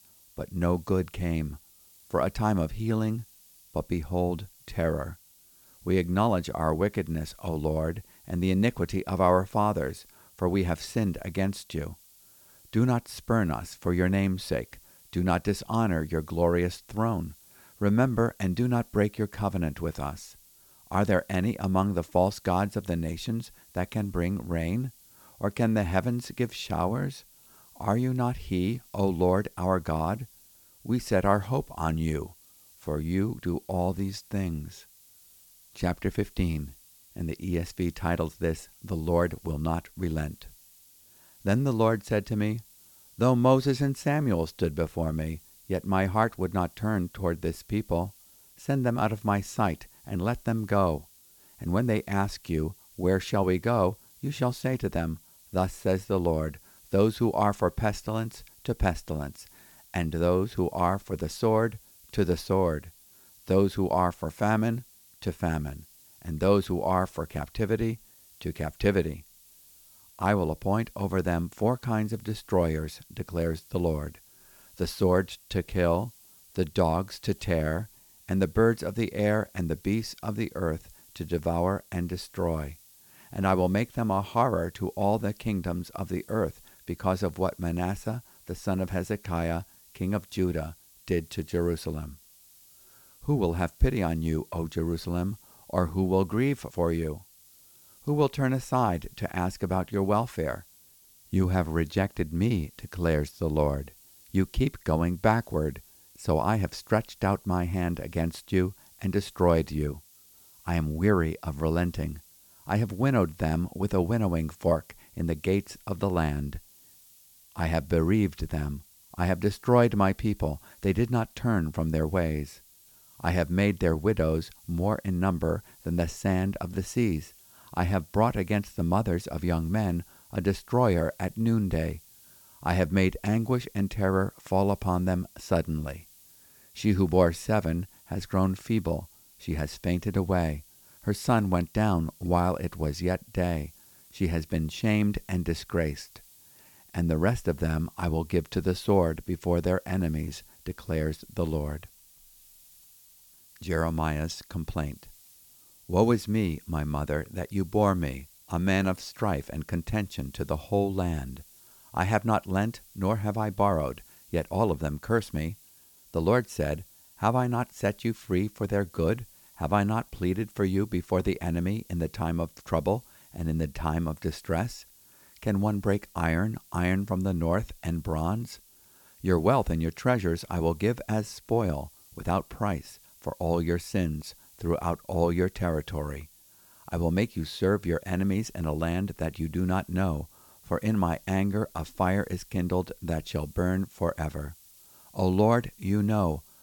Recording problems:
hiss; faint; throughout; 25 dB below the speech

